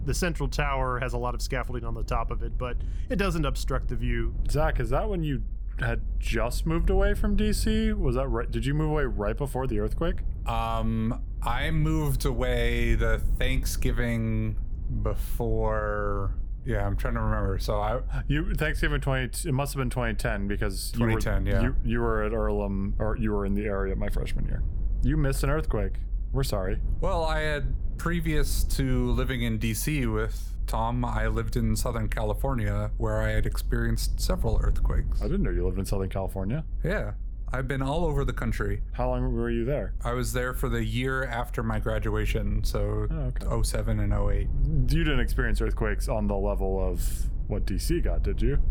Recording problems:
low rumble; faint; throughout; 20 dB below the speech

